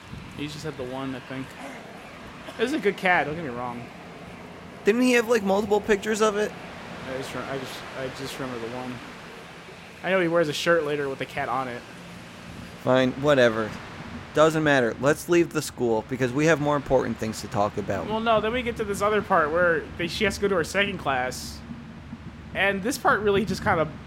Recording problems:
train or aircraft noise; noticeable; throughout; 15 dB below the speech

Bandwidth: 16 kHz